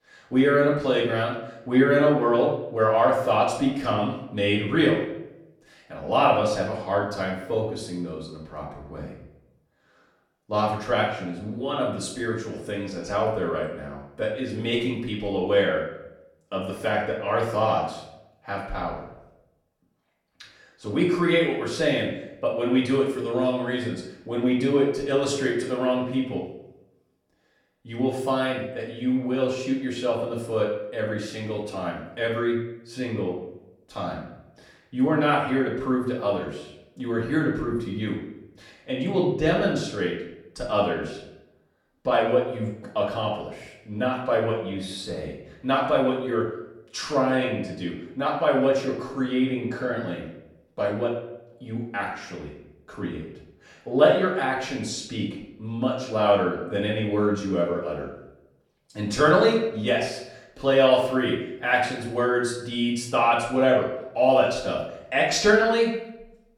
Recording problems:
off-mic speech; far
room echo; noticeable; dies away in 0.6 s

